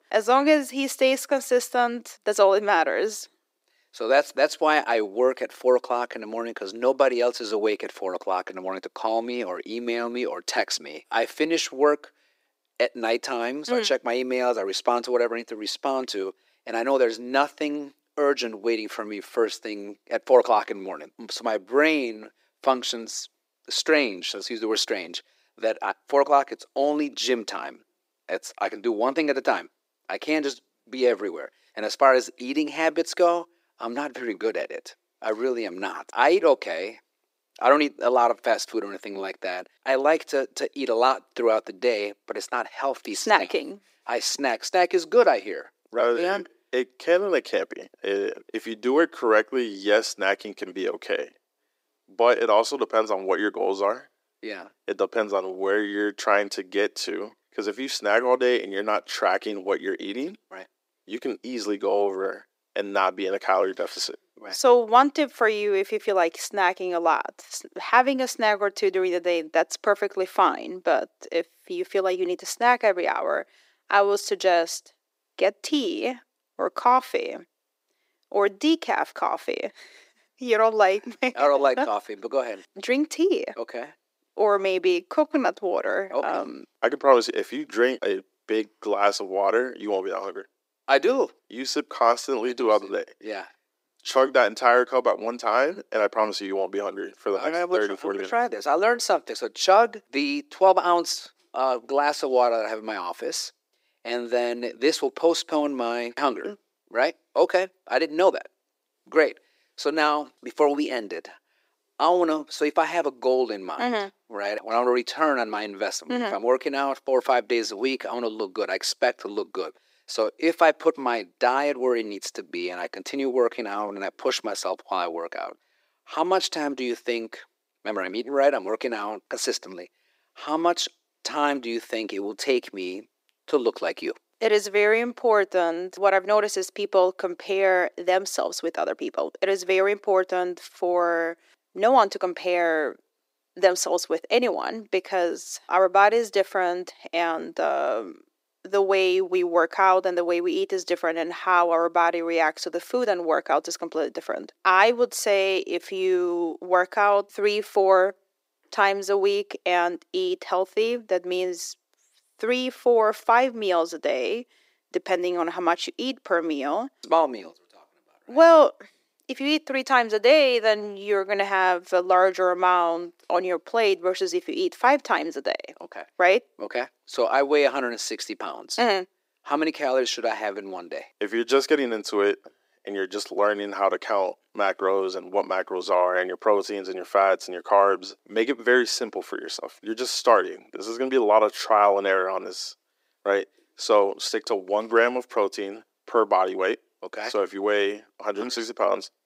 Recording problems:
thin; somewhat; fading below 350 Hz

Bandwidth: 15.5 kHz